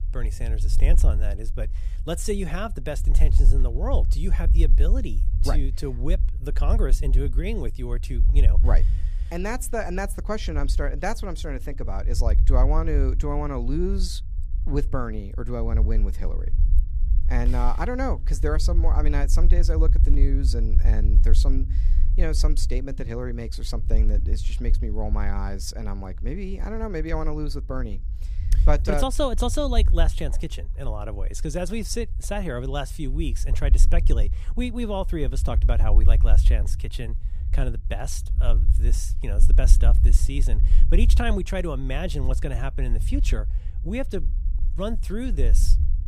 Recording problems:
low rumble; noticeable; throughout; 15 dB below the speech

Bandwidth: 15 kHz